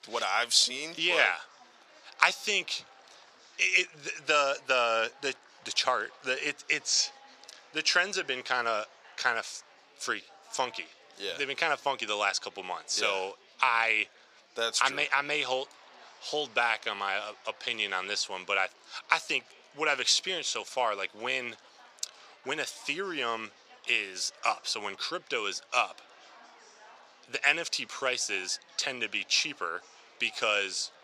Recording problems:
thin; very; fading below 750 Hz
murmuring crowd; faint; throughout; 25 dB below the speech

